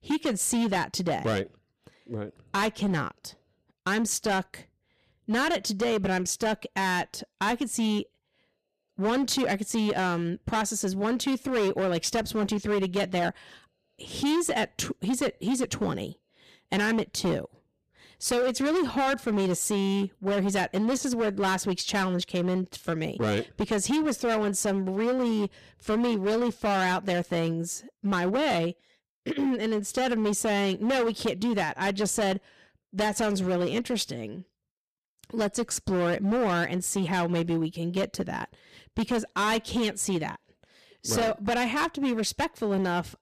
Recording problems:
distortion; heavy; 16% of the sound clipped

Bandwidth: 14.5 kHz